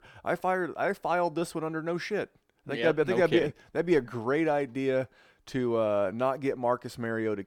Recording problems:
none

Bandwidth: 18 kHz